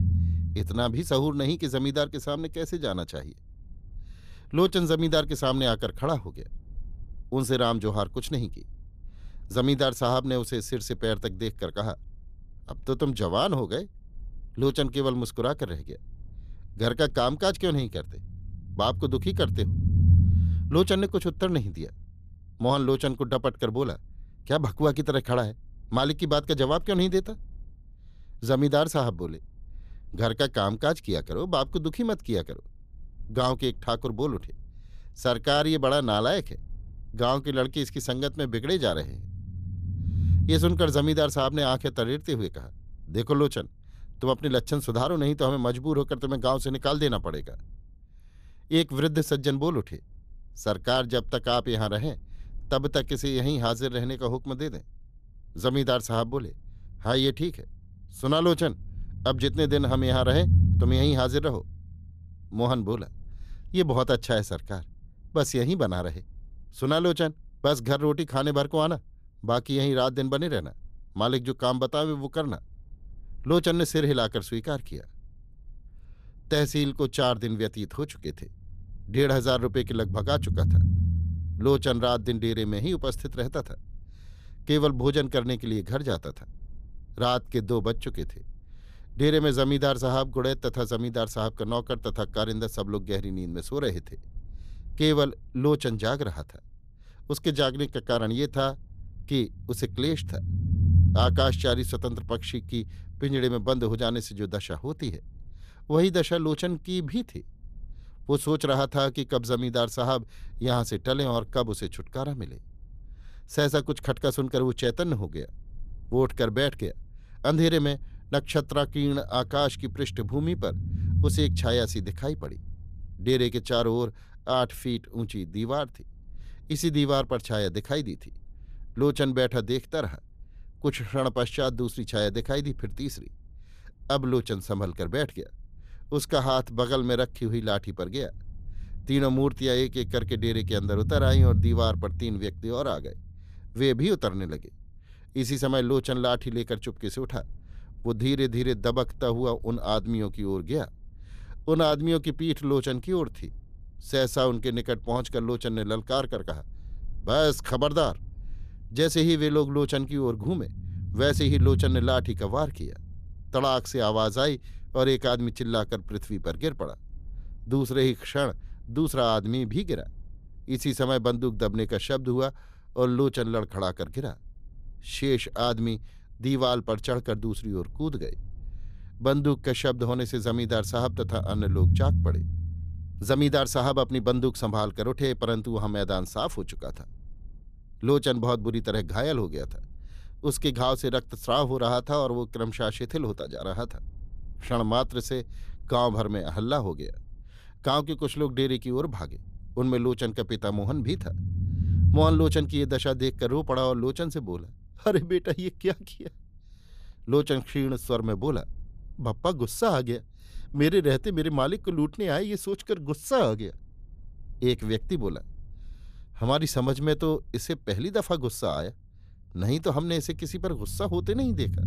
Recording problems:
low rumble; noticeable; throughout; 15 dB below the speech

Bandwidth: 14.5 kHz